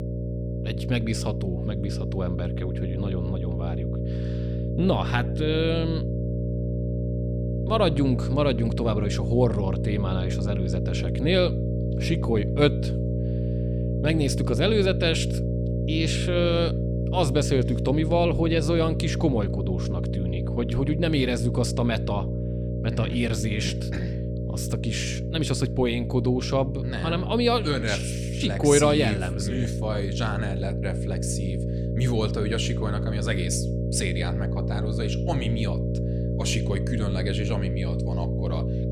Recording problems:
electrical hum; loud; throughout; 60 Hz, 7 dB below the speech

